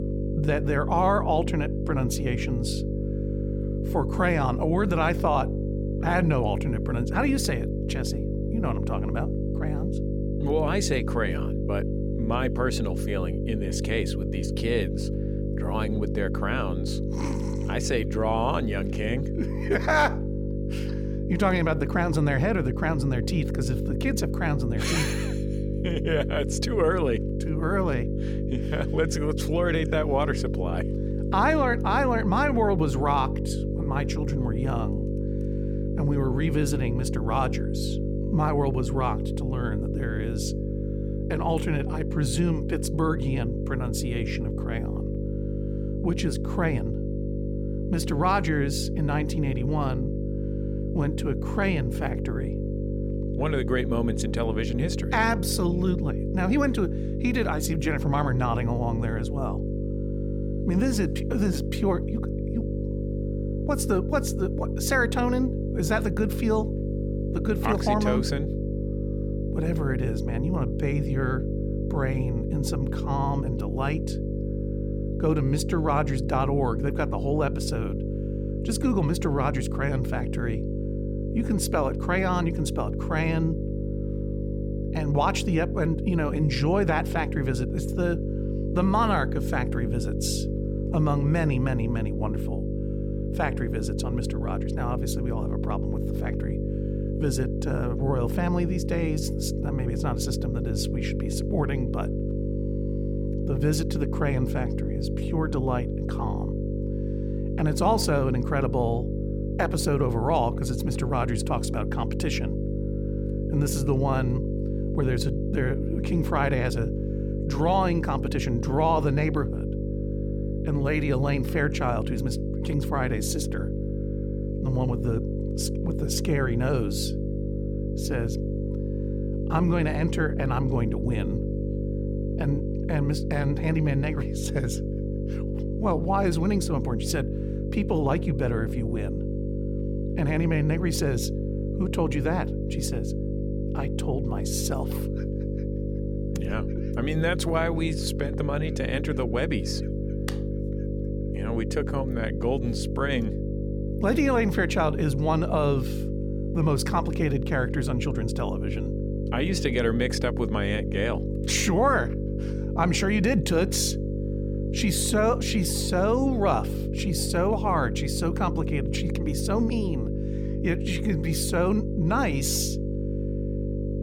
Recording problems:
electrical hum; loud; throughout; 50 Hz, 7 dB below the speech

